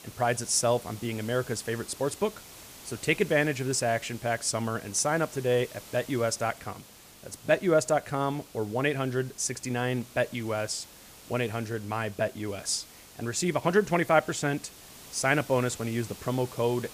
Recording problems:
hiss; noticeable; throughout; 20 dB below the speech

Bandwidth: 15 kHz